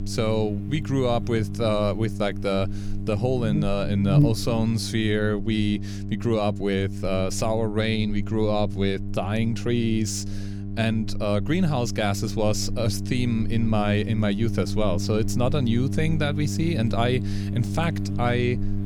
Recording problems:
electrical hum; noticeable; throughout; 50 Hz, 10 dB below the speech

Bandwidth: 18.5 kHz